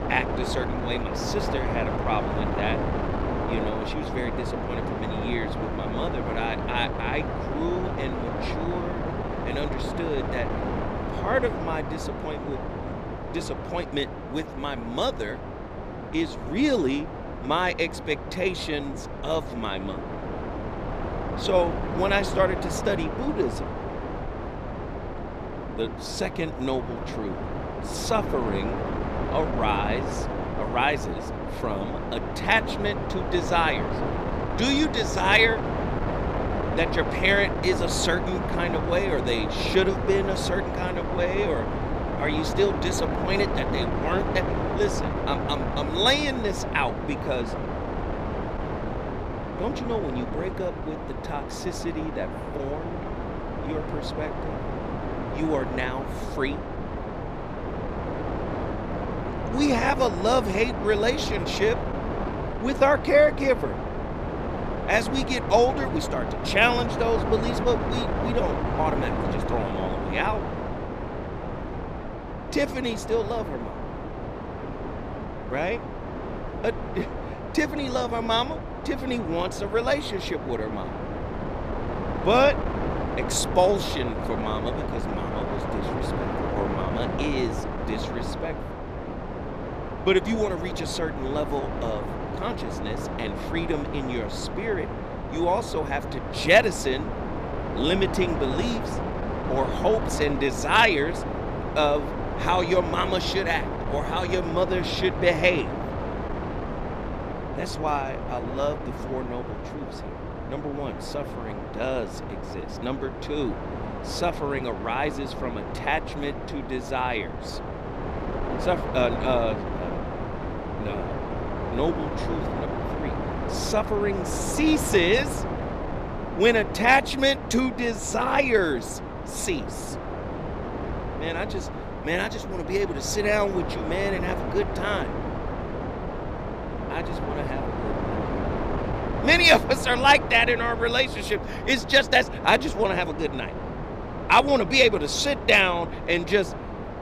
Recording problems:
wind noise on the microphone; heavy; 7 dB below the speech

